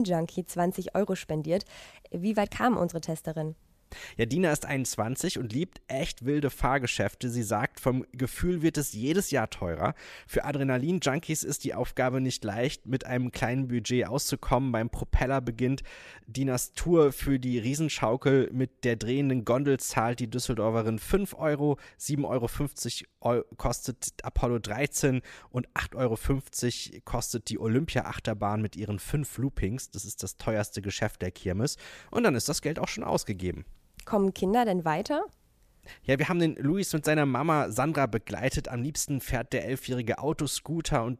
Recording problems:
abrupt cut into speech; at the start

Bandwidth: 14.5 kHz